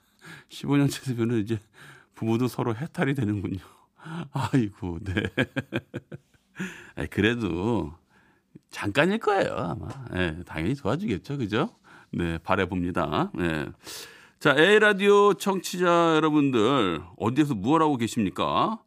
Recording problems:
none

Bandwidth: 15 kHz